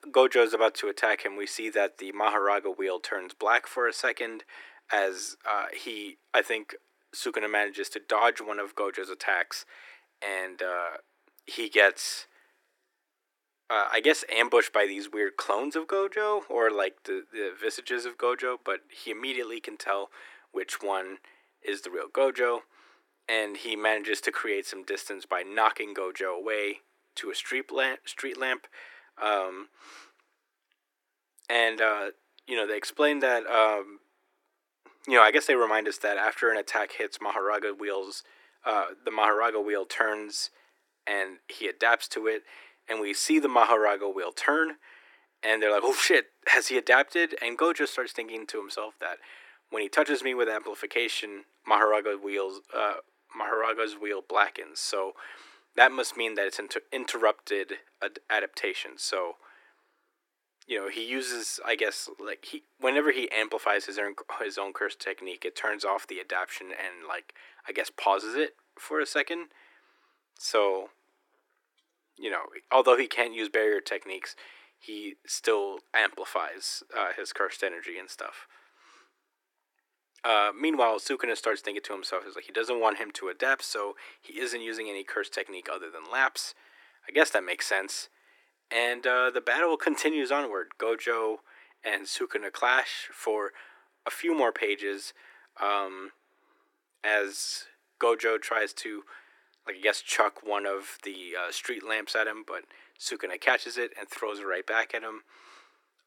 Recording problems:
thin; very; fading below 300 Hz

